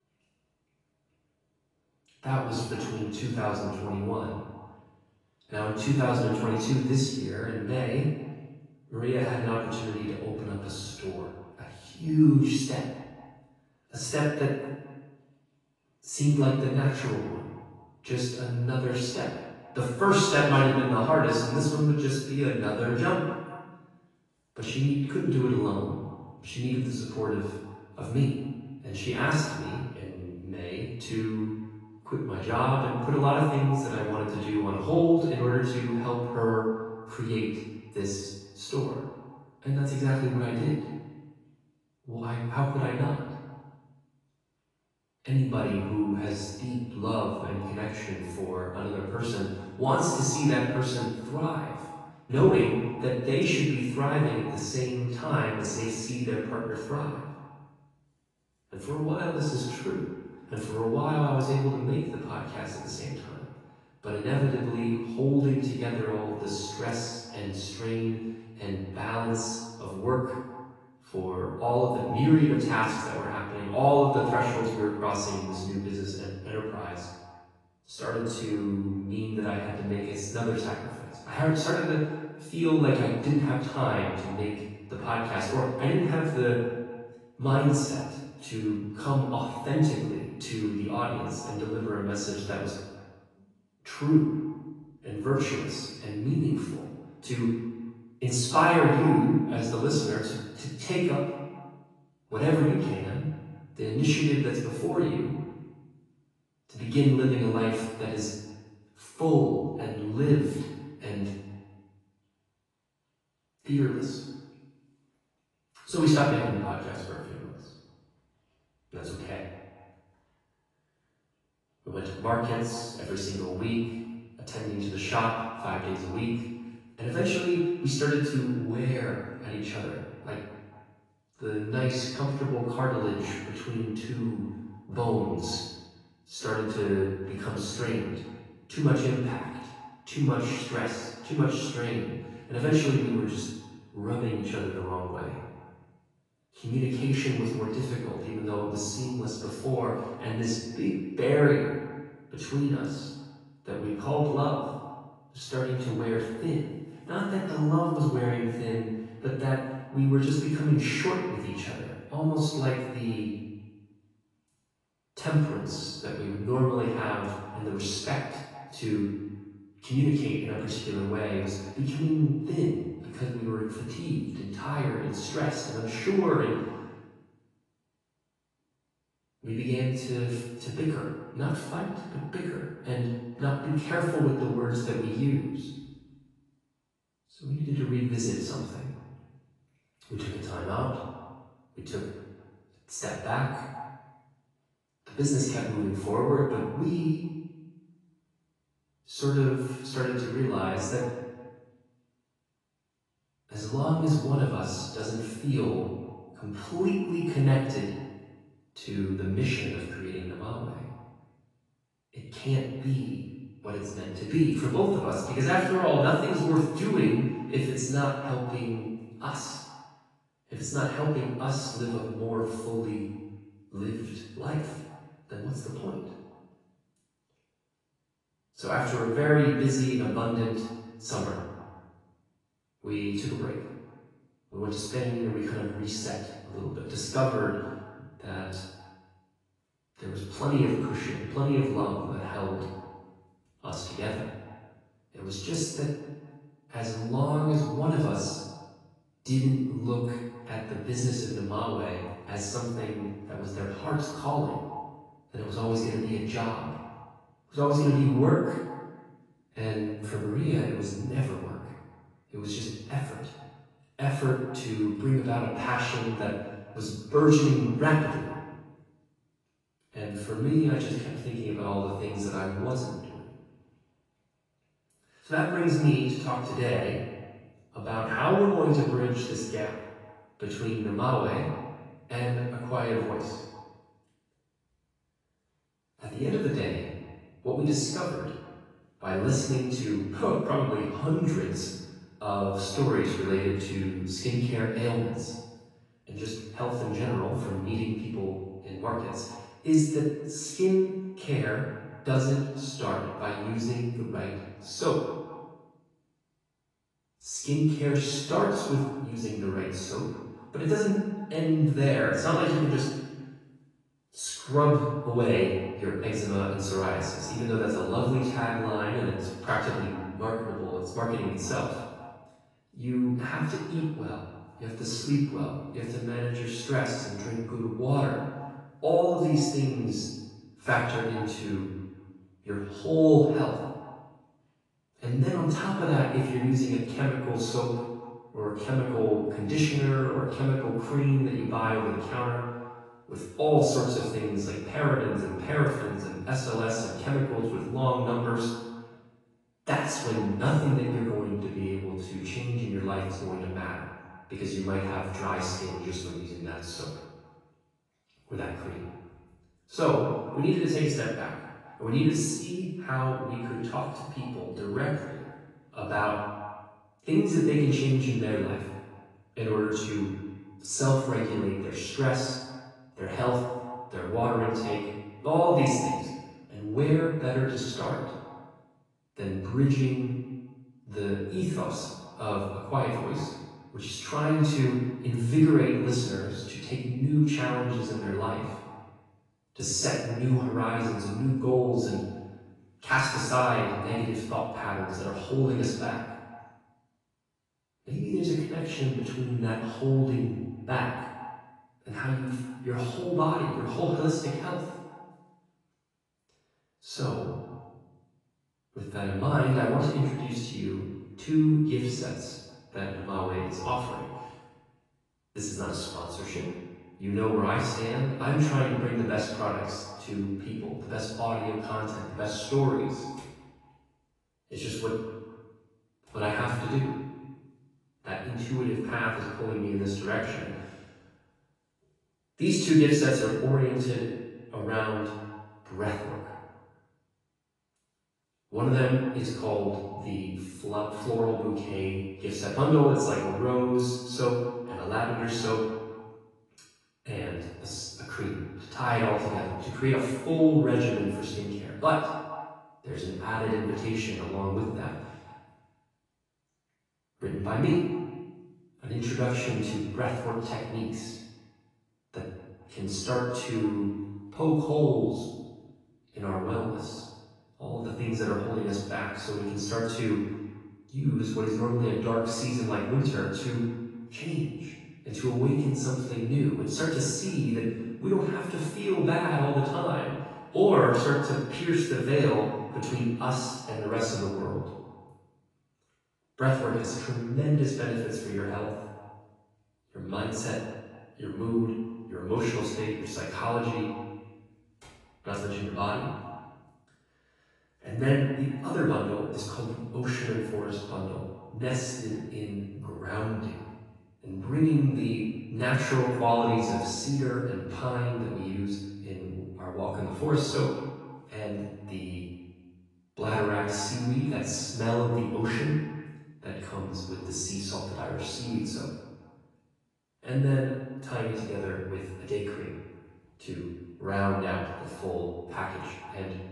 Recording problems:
off-mic speech; far
echo of what is said; noticeable; throughout; 220 ms later, 15 dB below the speech
room echo; noticeable; dies away in 0.8 s
garbled, watery; slightly; nothing above 10.5 kHz

